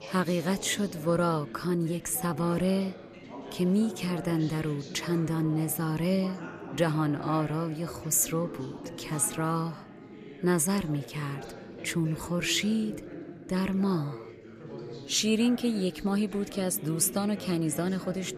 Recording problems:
background chatter; noticeable; throughout; 4 voices, 15 dB below the speech

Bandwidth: 14.5 kHz